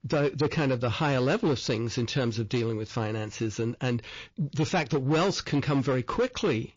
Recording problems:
distortion; slight; 9% of the sound clipped
garbled, watery; slightly; nothing above 6 kHz
high-pitched whine; very faint; from 2.5 s on; 5 kHz, 70 dB below the speech

